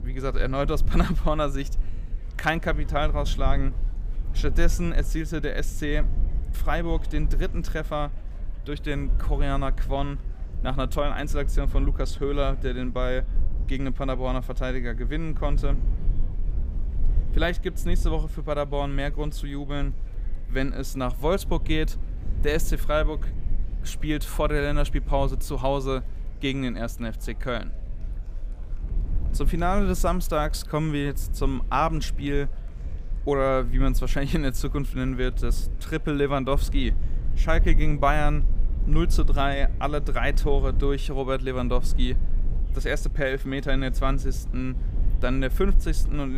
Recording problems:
chatter from many people; faint; throughout; 25 dB below the speech
low rumble; faint; throughout; 20 dB below the speech
abrupt cut into speech; at the end

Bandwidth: 15 kHz